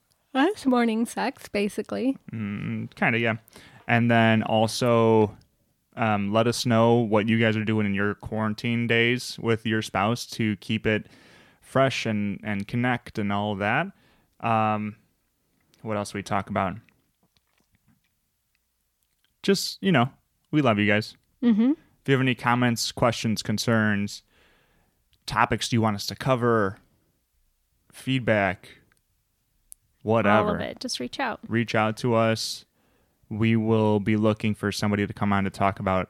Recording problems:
none

